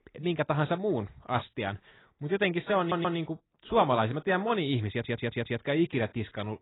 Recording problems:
garbled, watery; badly; nothing above 4 kHz
audio stuttering; at 3 s and at 5 s

